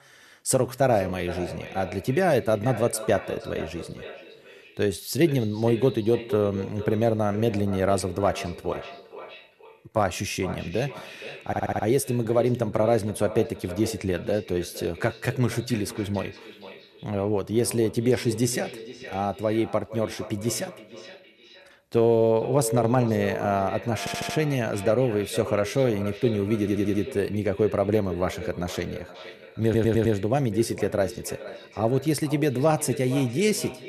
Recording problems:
echo of what is said; noticeable; throughout; 470 ms later, 15 dB below the speech
audio stuttering; 4 times, first at 11 s

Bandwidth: 13.5 kHz